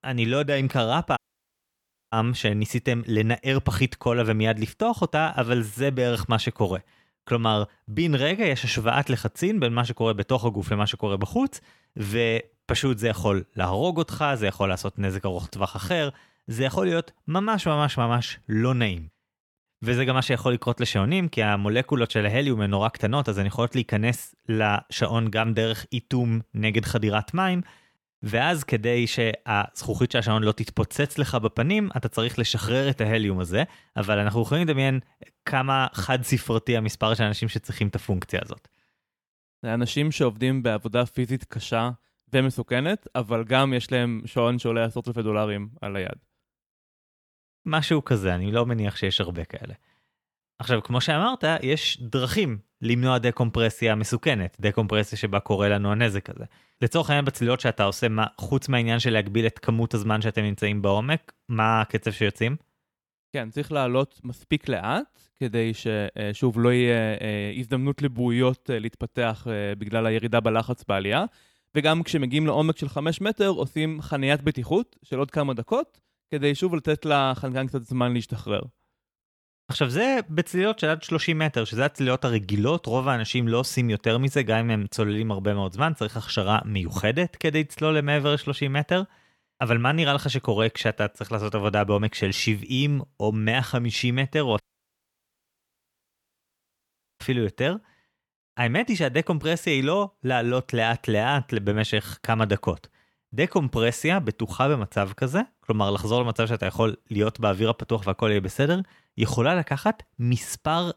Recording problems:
audio cutting out; at 1 s for 1 s and at 1:35 for 2.5 s

